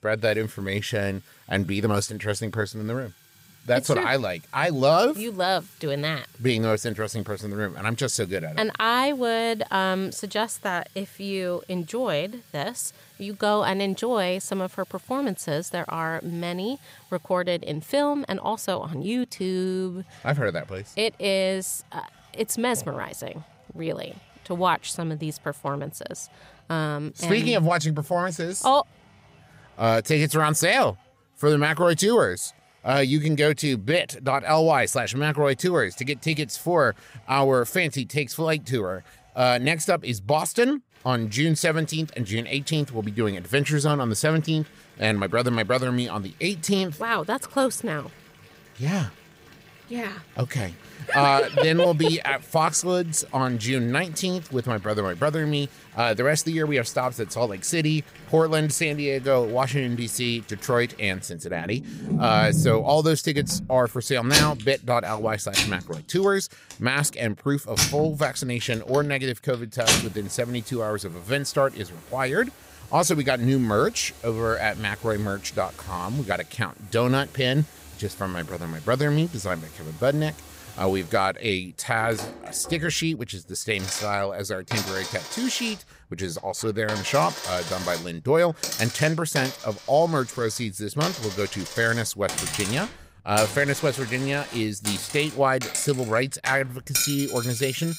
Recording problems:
household noises; loud; throughout; 6 dB below the speech

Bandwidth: 15.5 kHz